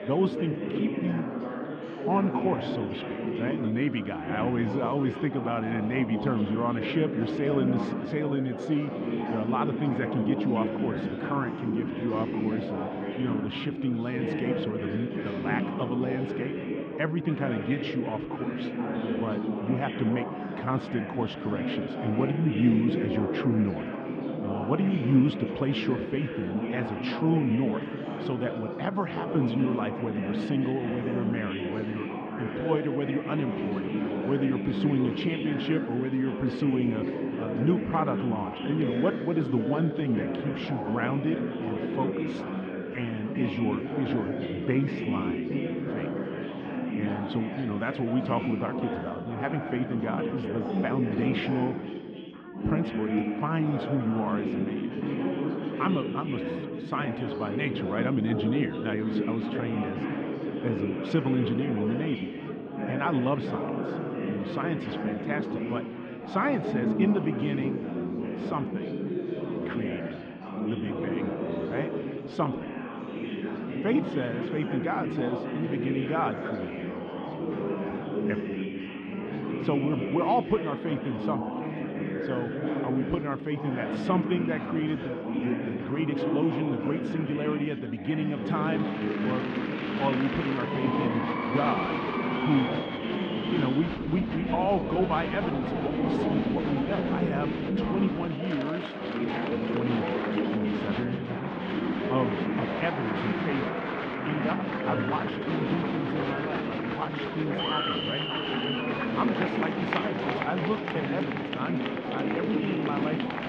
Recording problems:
muffled; very; fading above 3.5 kHz
chatter from many people; loud; throughout; as loud as the speech

